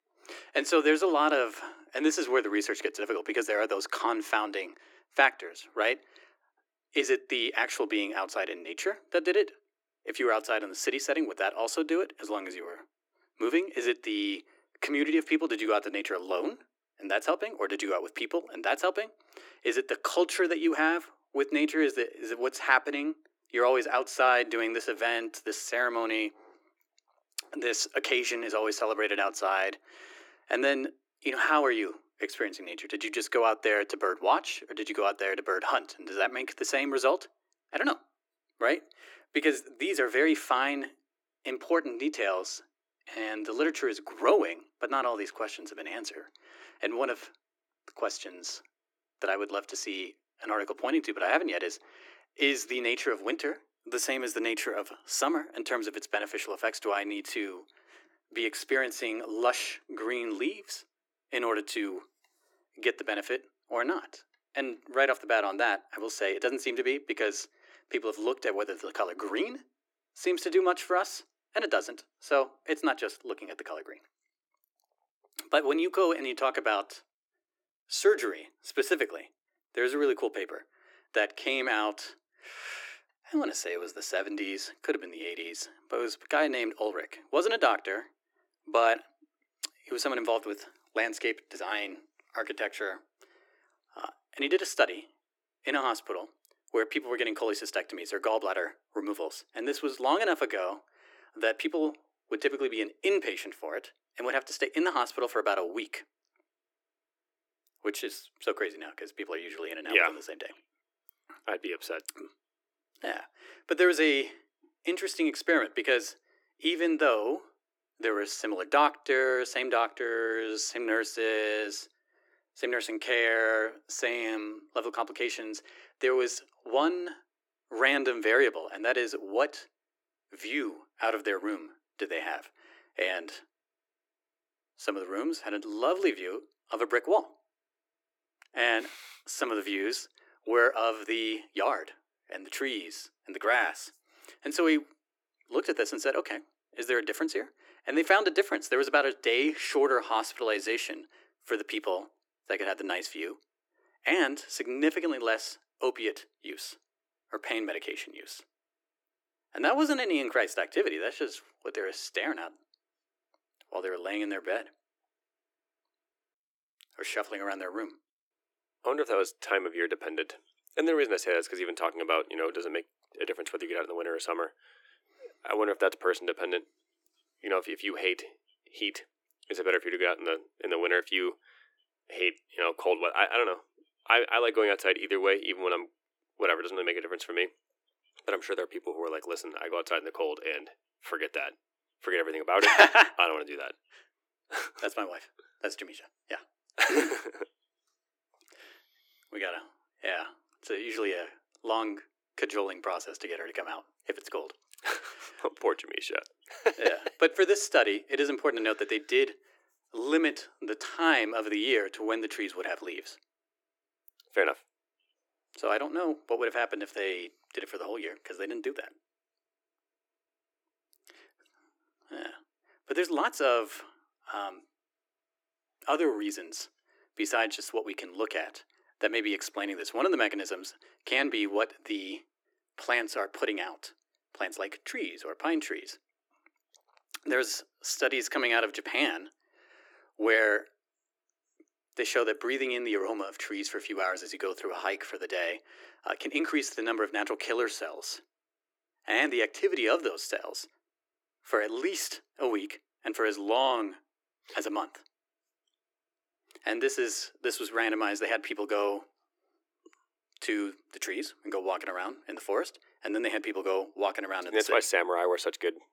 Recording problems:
thin; very; fading below 300 Hz

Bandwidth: 17.5 kHz